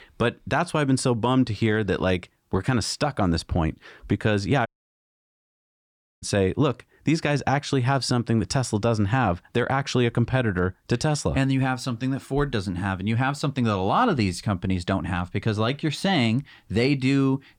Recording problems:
audio cutting out; at 4.5 s for 1.5 s

